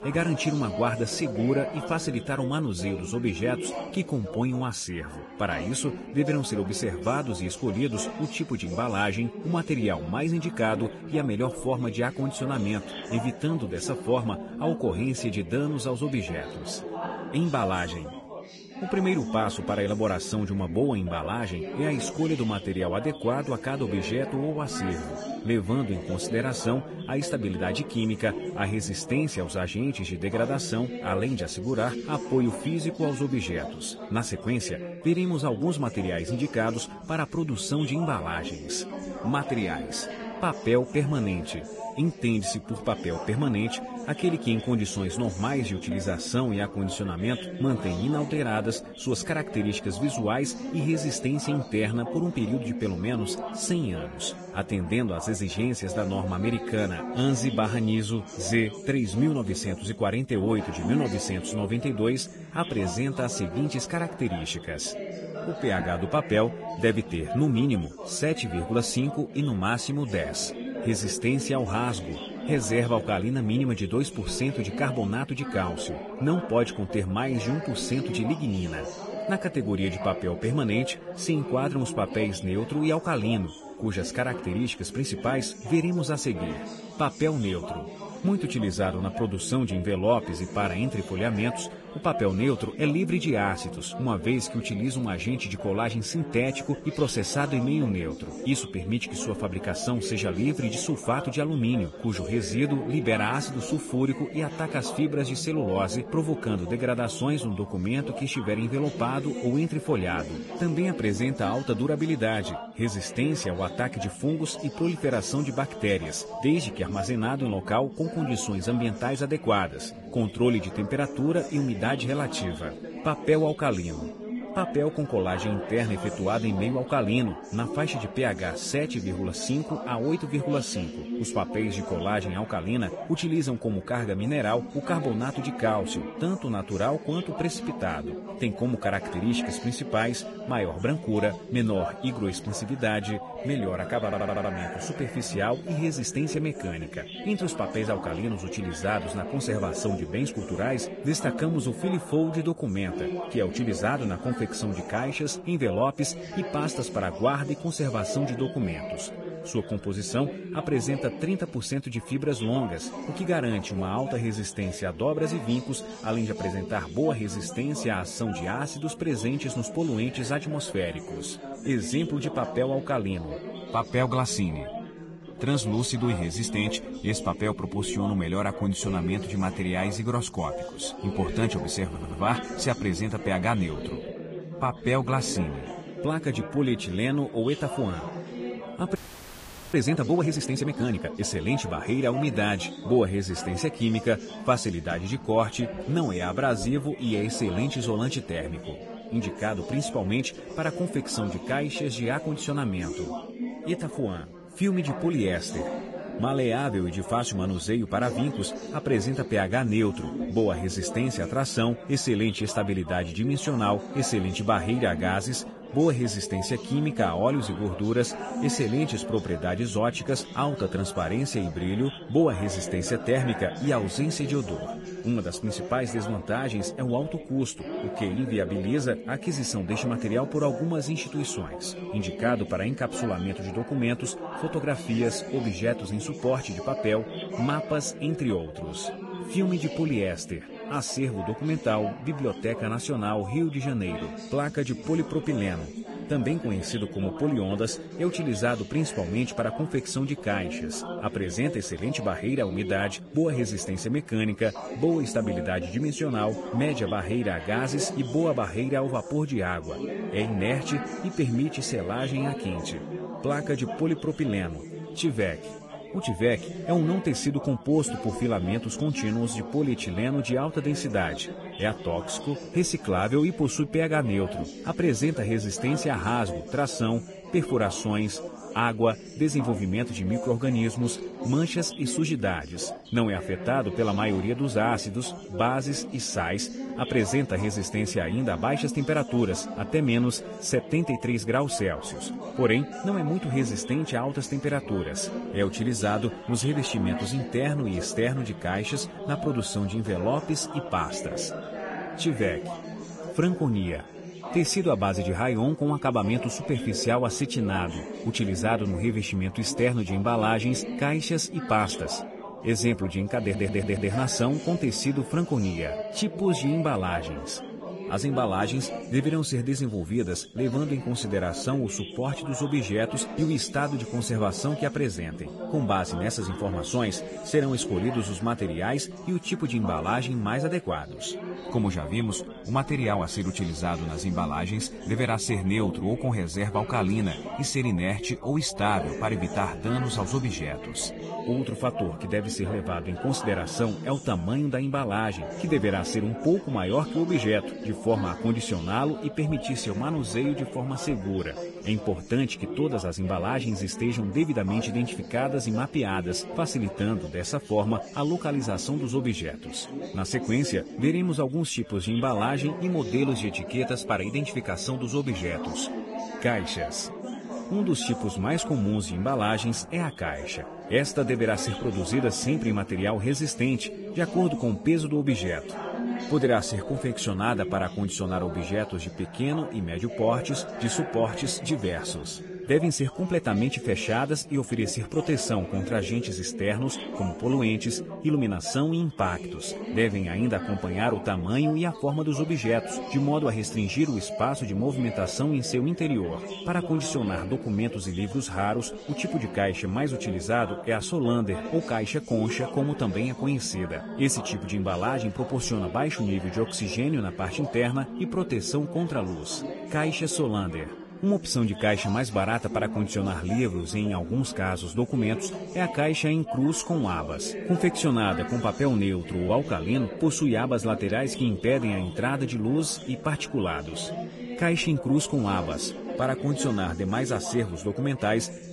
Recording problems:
garbled, watery; badly; nothing above 10.5 kHz
background chatter; loud; throughout; 4 voices, 9 dB below the speech
audio stuttering; at 2:24, at 3:02 and at 5:13
audio freezing; at 3:09 for 1 s

